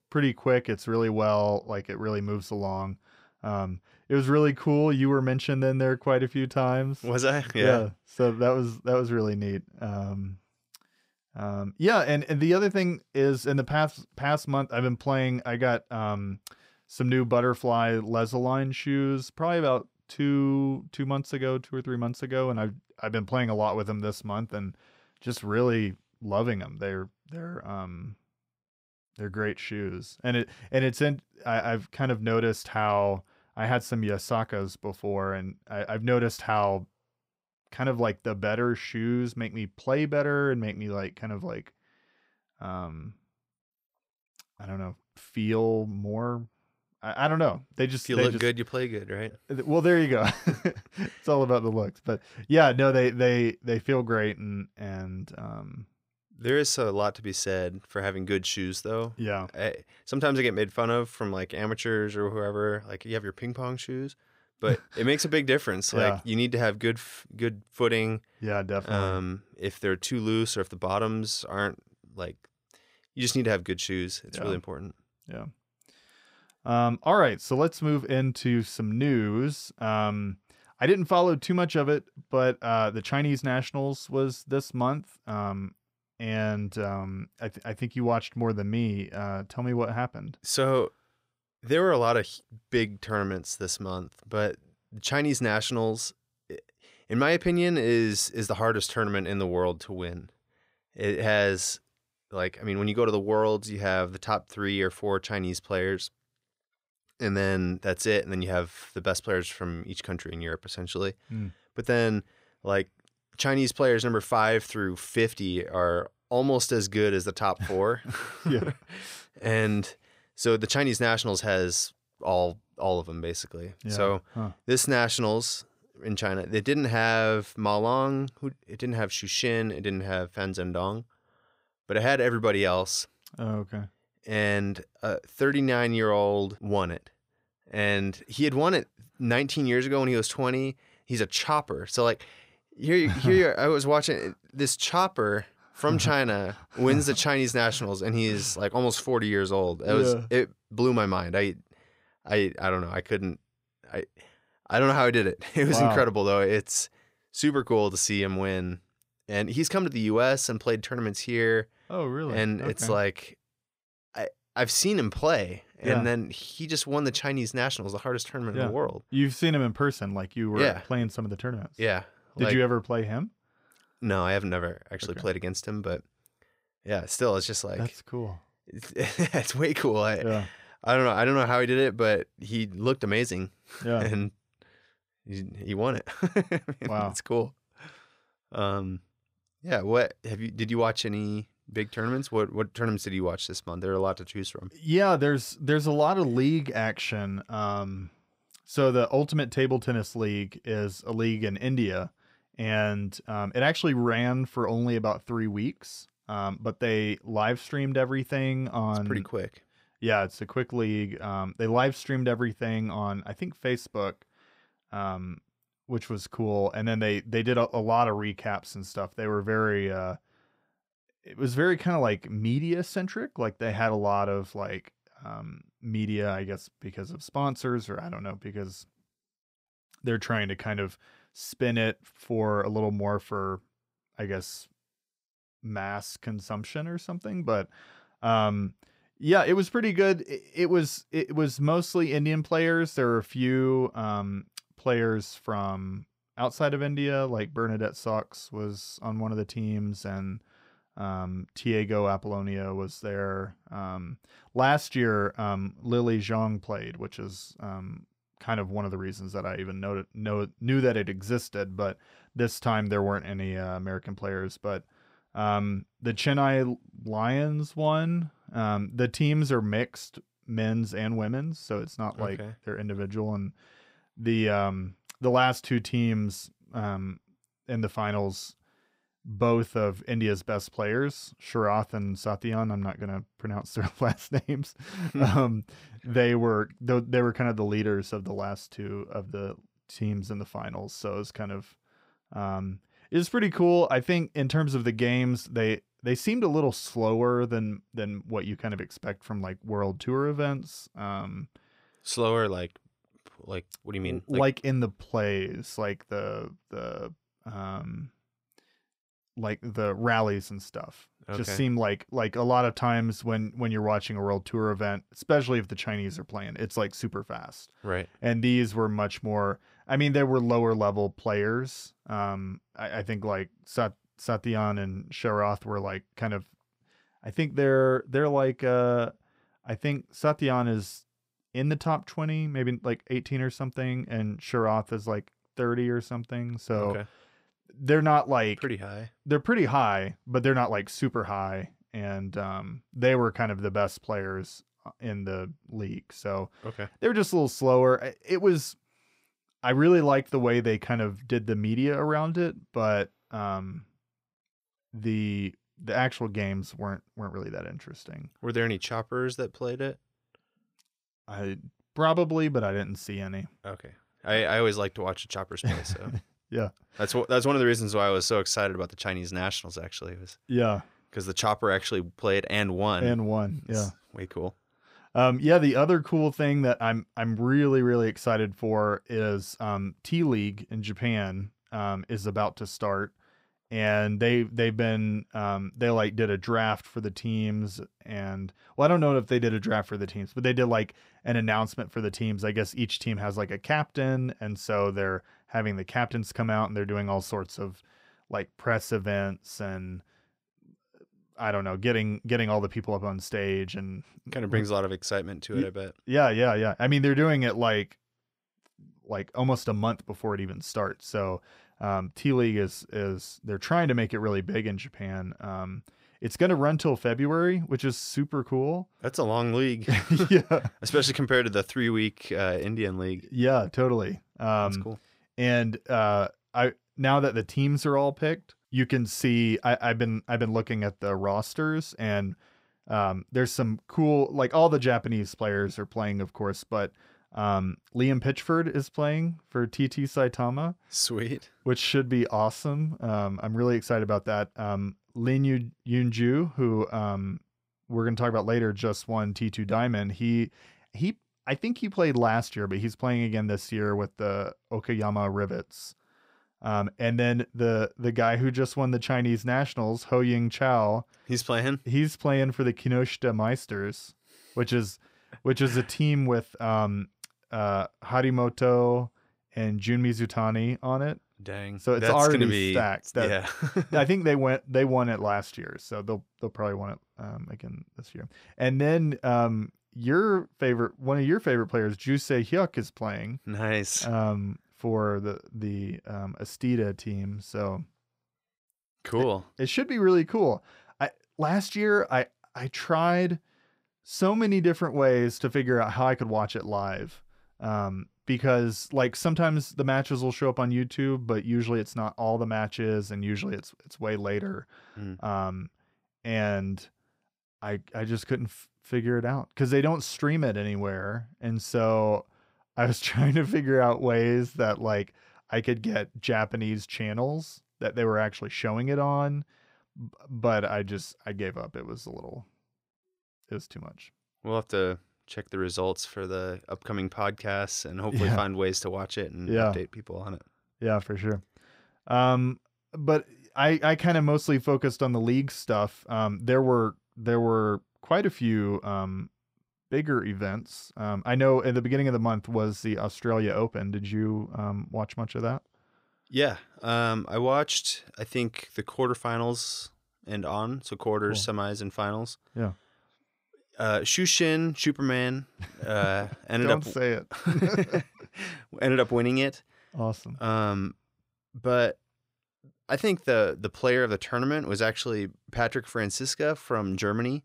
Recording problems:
none

